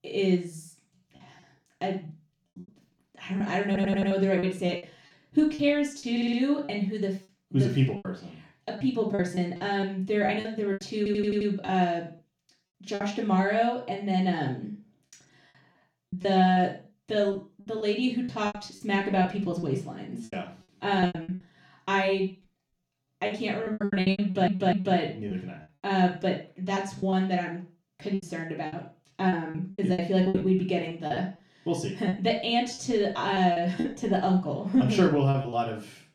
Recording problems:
off-mic speech; far
room echo; noticeable; dies away in 0.3 s
choppy; very; 11% of the speech affected
audio stuttering; 4 times, first at 3.5 s

